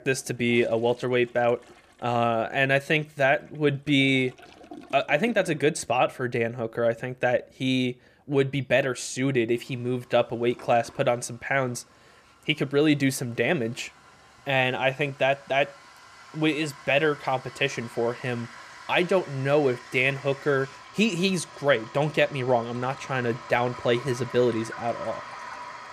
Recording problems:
household noises; noticeable; throughout; 20 dB below the speech

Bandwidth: 14.5 kHz